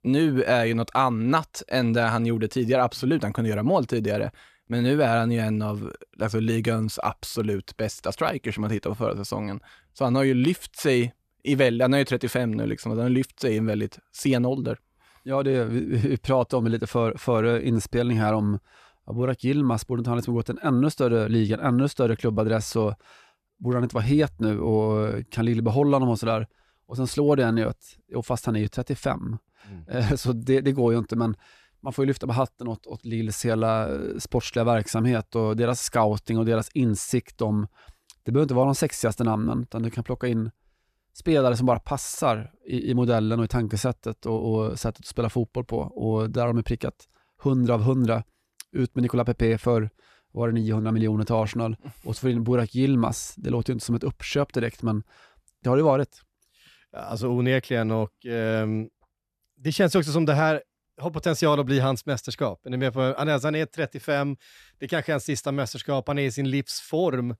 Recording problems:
none

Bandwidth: 14 kHz